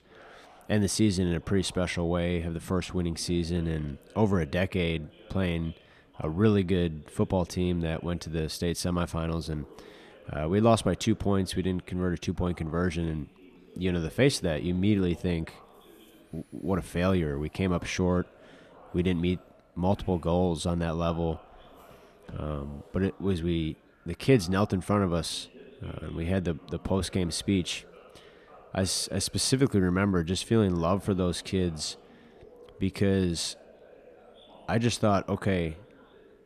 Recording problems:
background chatter; faint; throughout; 3 voices, 25 dB below the speech

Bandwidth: 14 kHz